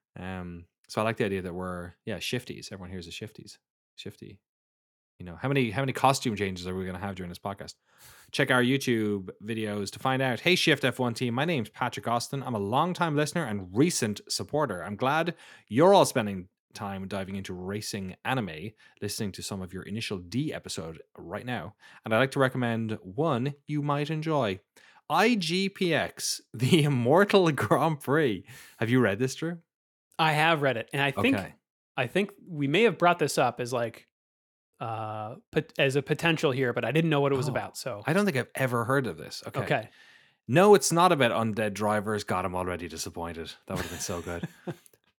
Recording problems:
none

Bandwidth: 18 kHz